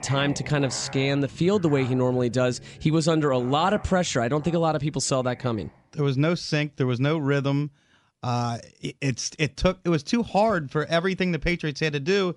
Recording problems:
background music; noticeable; throughout; 20 dB below the speech

